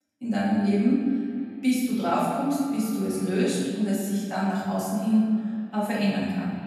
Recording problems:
room echo; strong; dies away in 1.5 s
off-mic speech; far
echo of what is said; noticeable; throughout; 230 ms later, 15 dB below the speech

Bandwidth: 13.5 kHz